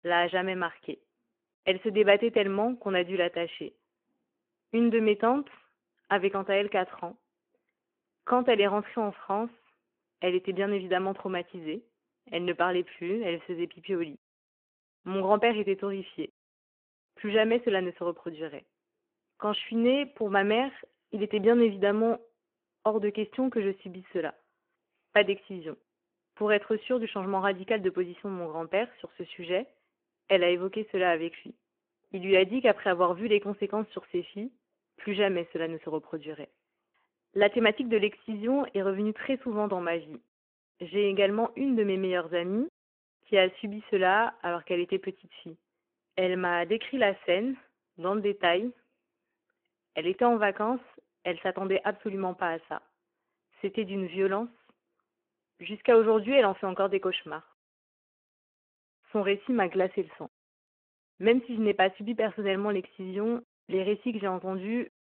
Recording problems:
phone-call audio

